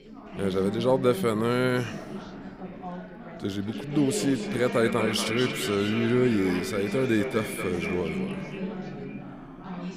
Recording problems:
echo of what is said; strong; from 3.5 s on; 230 ms later, 8 dB below the speech
background chatter; loud; throughout; 4 voices, 9 dB below the speech

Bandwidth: 15.5 kHz